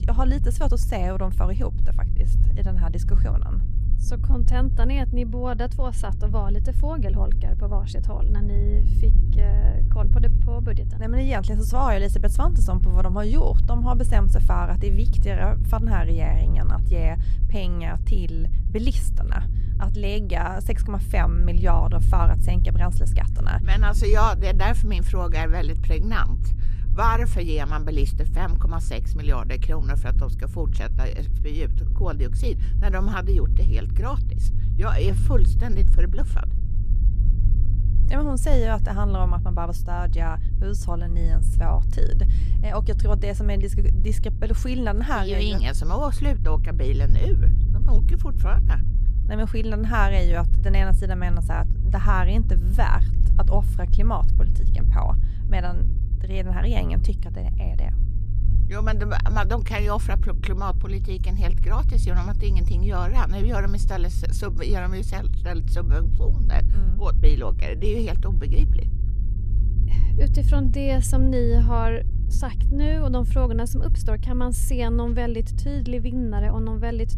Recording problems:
low rumble; noticeable; throughout; 10 dB below the speech

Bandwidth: 14 kHz